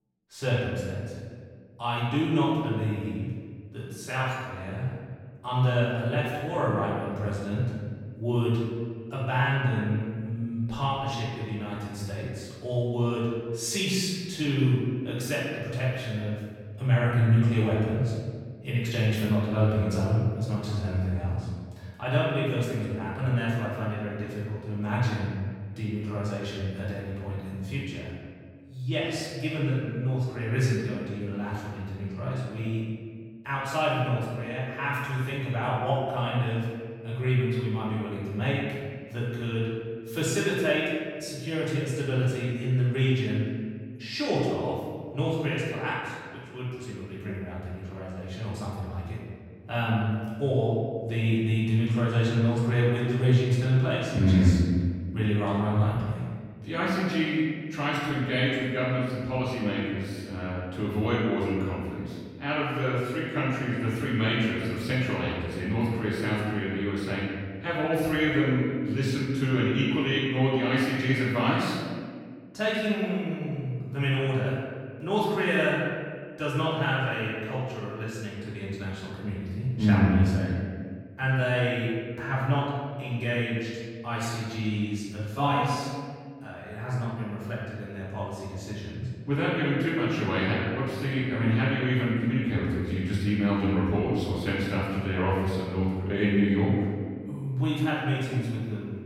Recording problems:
room echo; strong; dies away in 1.7 s
off-mic speech; far

